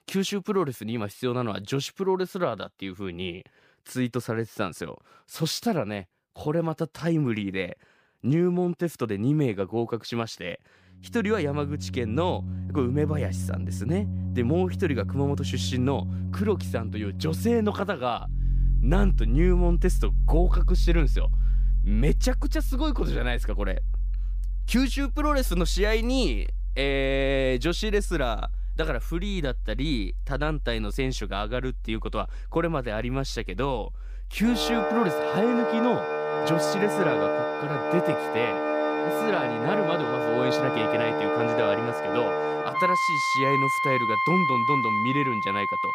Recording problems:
background music; very loud; from 11 s on; as loud as the speech

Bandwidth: 15 kHz